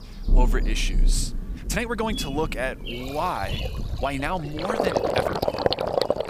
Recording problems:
rain or running water; very loud; throughout; 2 dB above the speech
animal sounds; noticeable; throughout; 10 dB below the speech
uneven, jittery; strongly; from 1.5 to 5.5 s

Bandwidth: 15 kHz